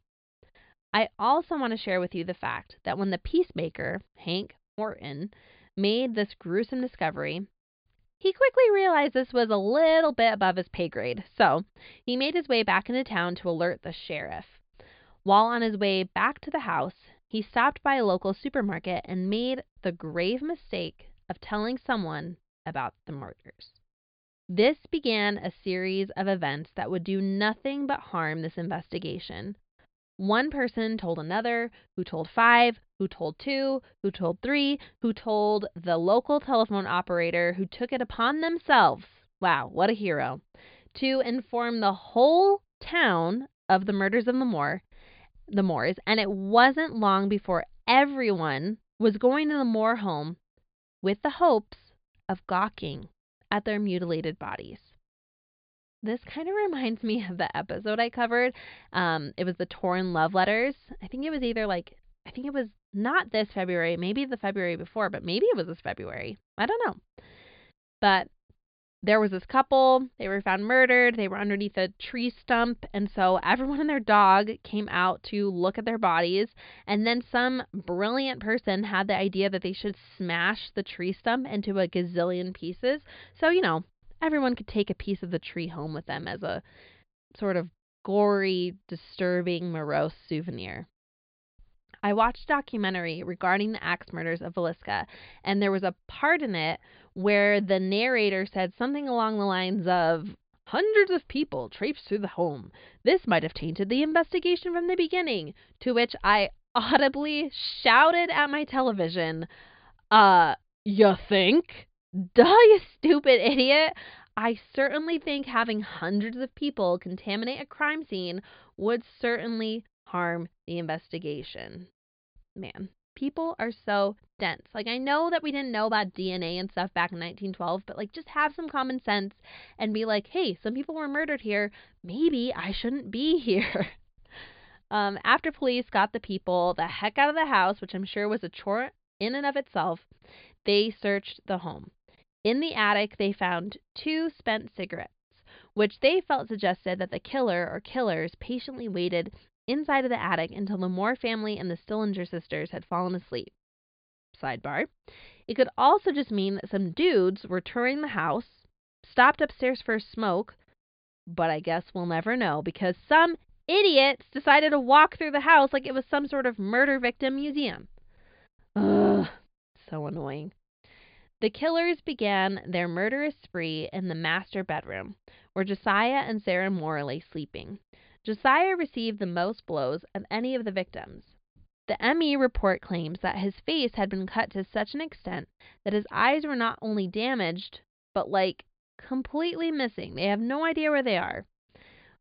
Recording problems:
high frequencies cut off; severe; nothing above 5 kHz

